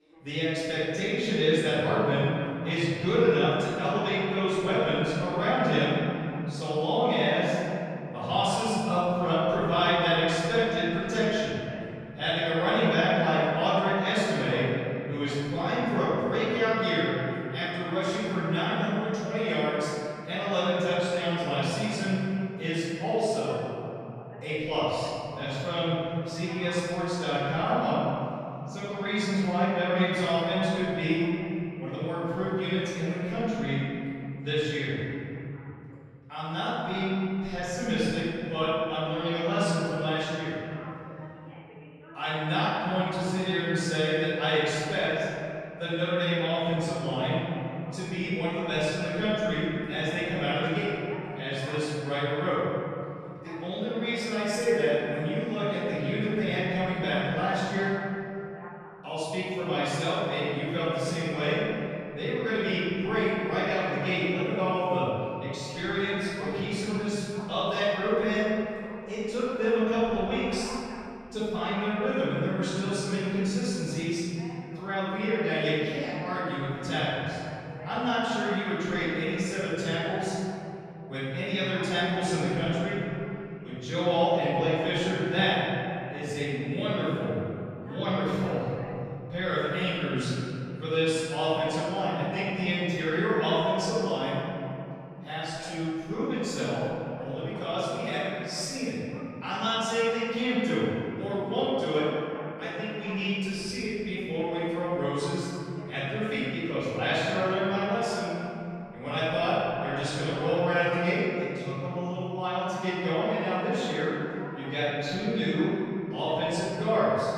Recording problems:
room echo; strong; dies away in 3 s
off-mic speech; far
voice in the background; faint; throughout; 20 dB below the speech

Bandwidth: 14.5 kHz